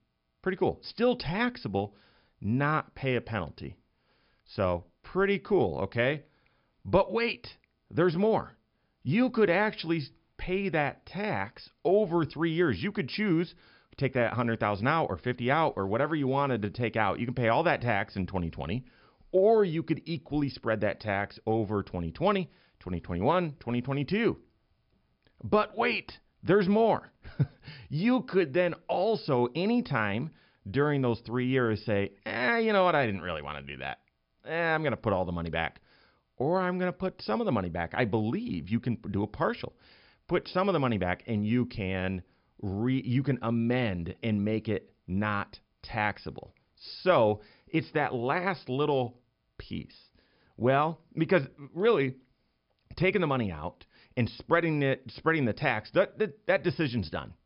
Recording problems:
high frequencies cut off; noticeable; nothing above 5.5 kHz

